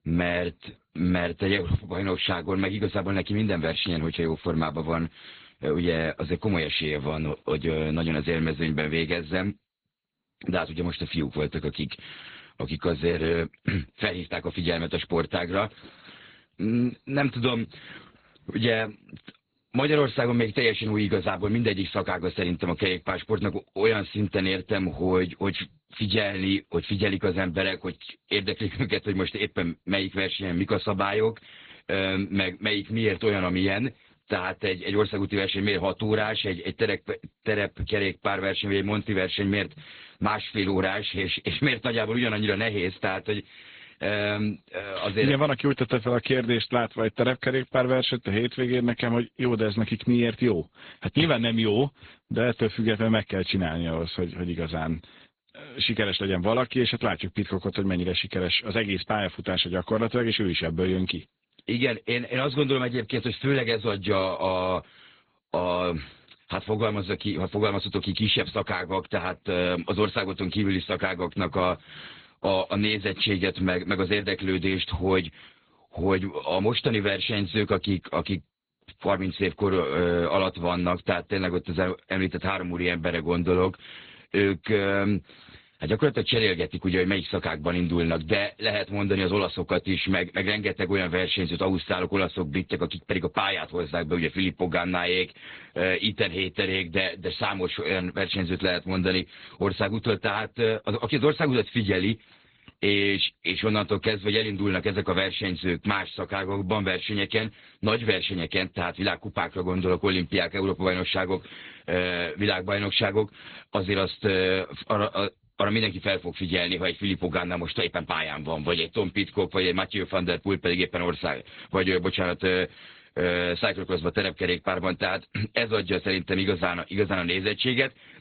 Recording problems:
garbled, watery; badly; nothing above 4 kHz

